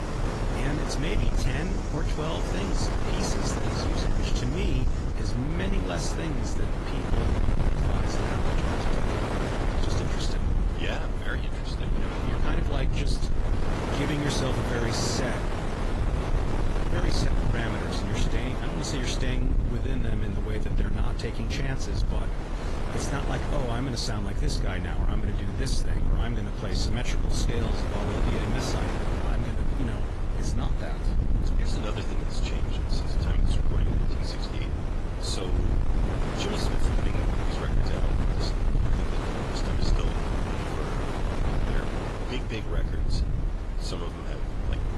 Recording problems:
distortion; slight; 10 dB below the speech
garbled, watery; slightly; nothing above 11.5 kHz
wind noise on the microphone; heavy; 1 dB above the speech
low rumble; loud; throughout; 7 dB below the speech
rain or running water; noticeable; until 13 s; 10 dB below the speech

